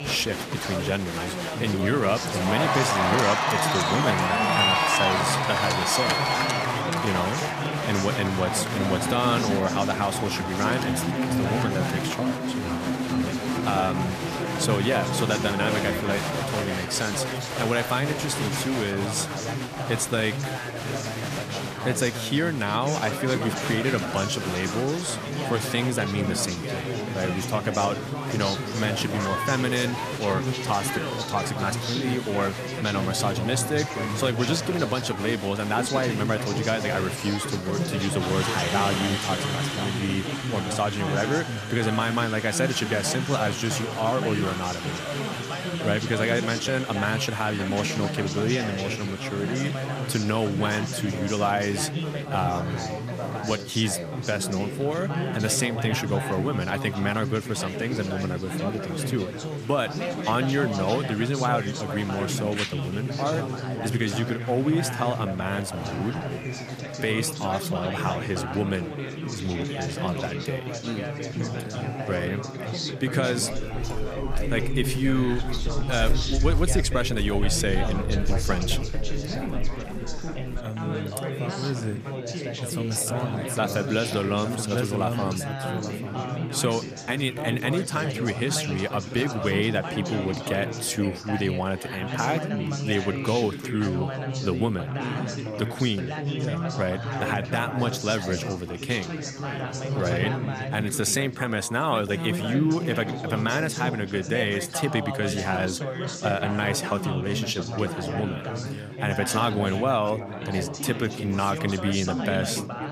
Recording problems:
chatter from many people; loud; throughout; 2 dB below the speech
footsteps; loud; from 1:14 to 1:21; peak 2 dB above the speech

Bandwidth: 14.5 kHz